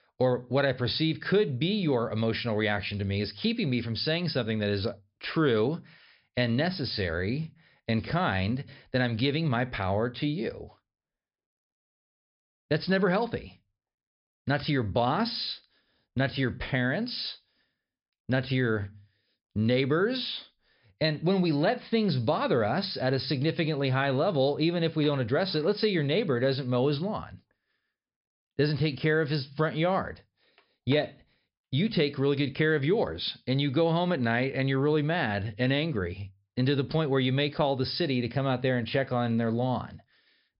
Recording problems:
high frequencies cut off; noticeable; nothing above 5.5 kHz

